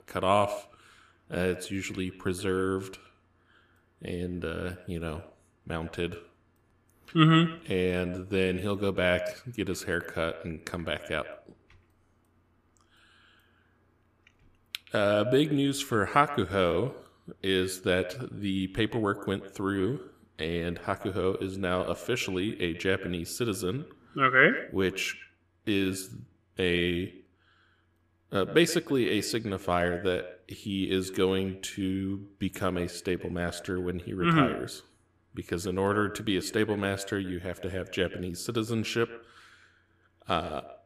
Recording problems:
echo of what is said; noticeable; throughout; 120 ms later, 15 dB below the speech

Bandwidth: 14.5 kHz